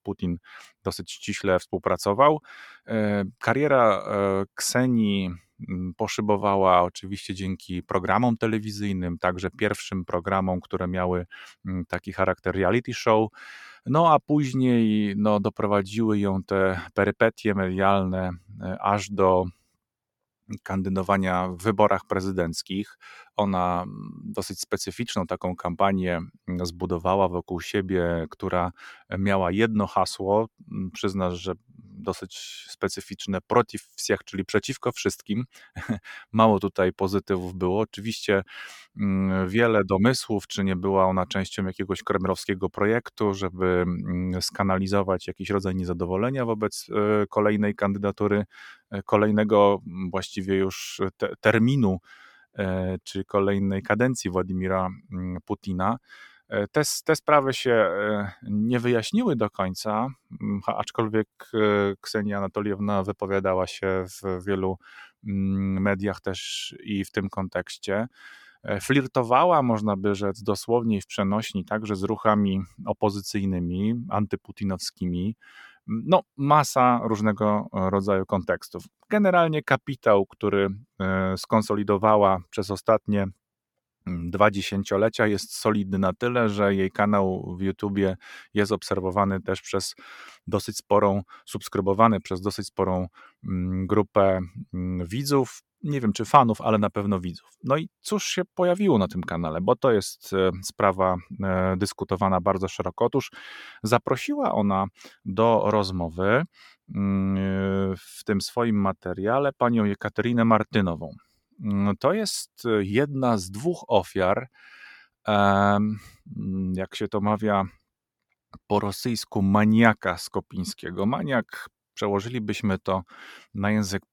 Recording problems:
none

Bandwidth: 18 kHz